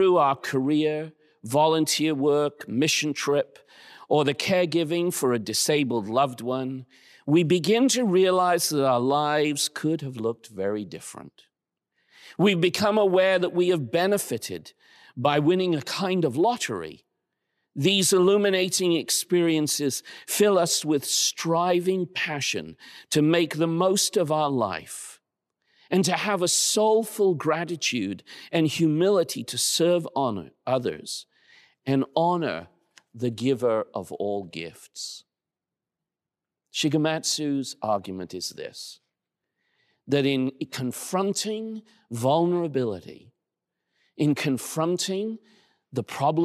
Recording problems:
abrupt cut into speech; at the start and the end

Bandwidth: 14 kHz